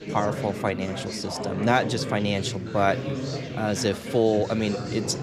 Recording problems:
chatter from many people; loud; throughout; 6 dB below the speech
rain or running water; faint; from 2.5 s on; 25 dB below the speech

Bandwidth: 14 kHz